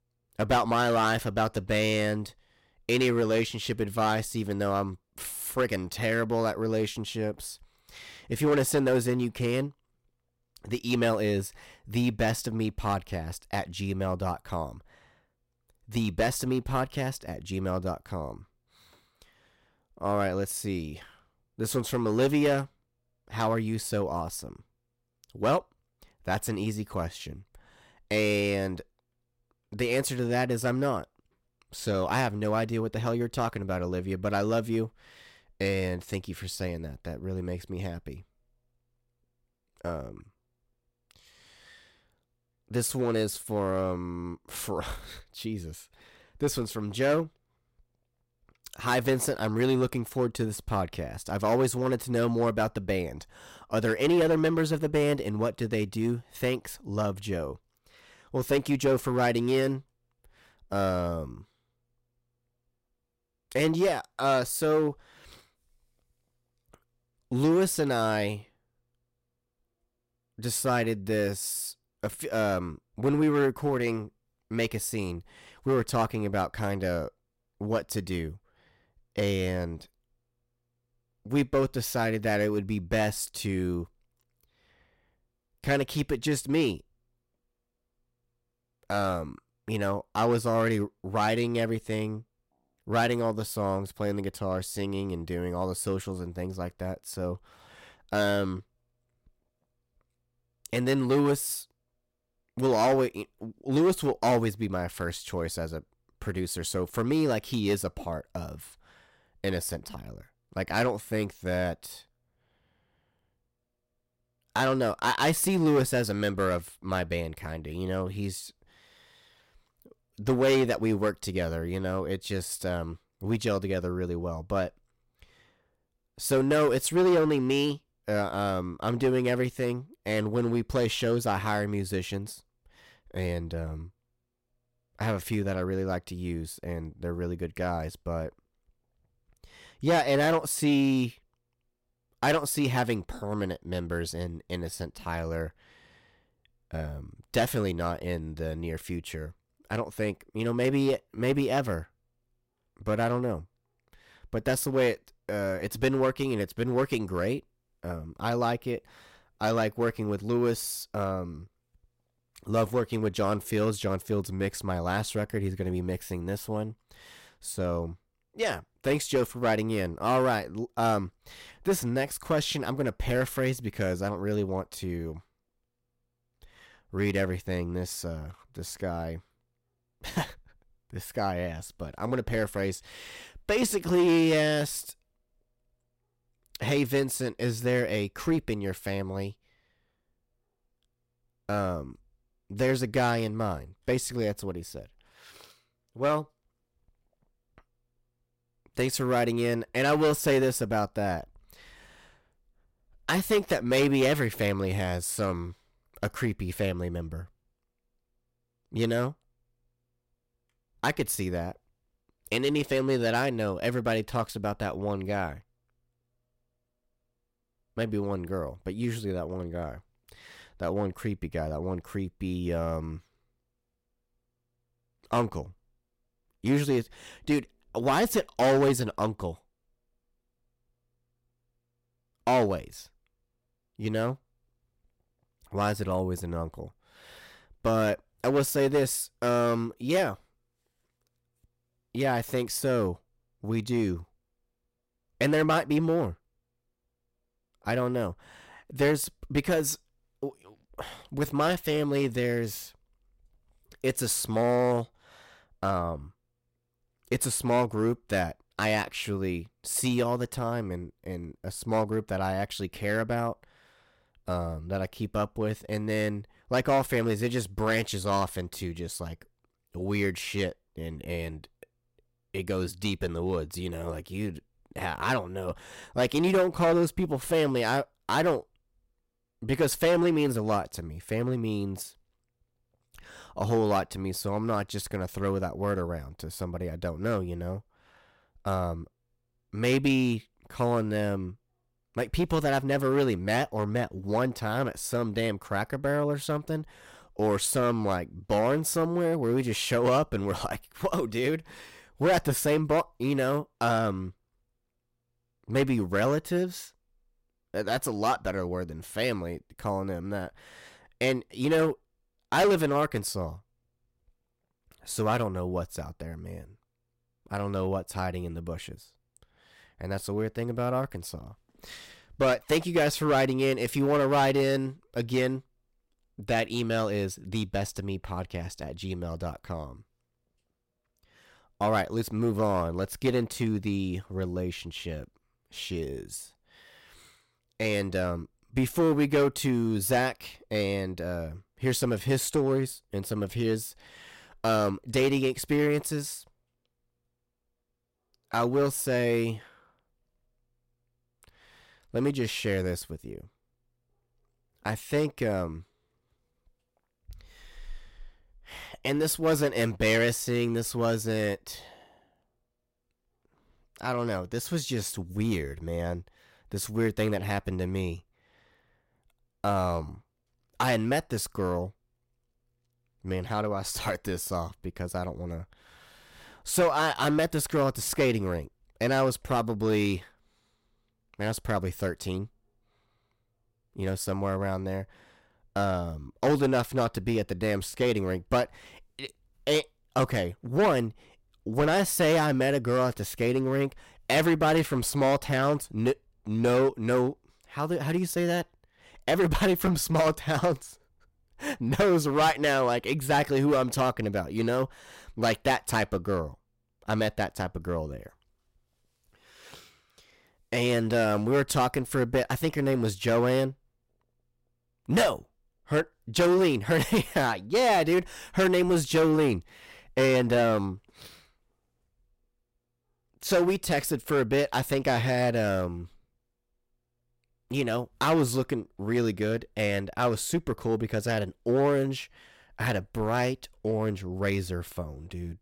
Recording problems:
distortion; slight; 3% of the sound clipped

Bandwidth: 16 kHz